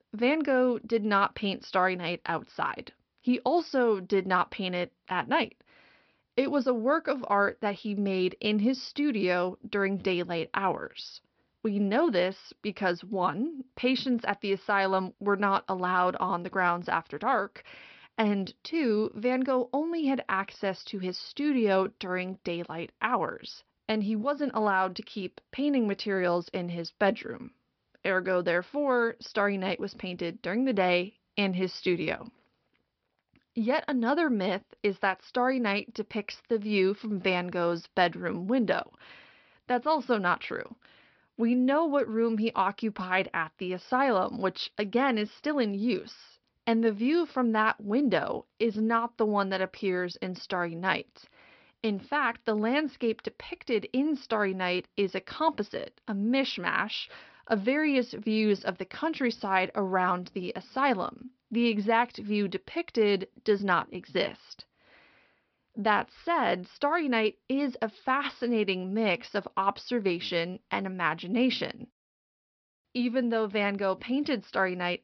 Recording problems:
high frequencies cut off; noticeable; nothing above 5.5 kHz

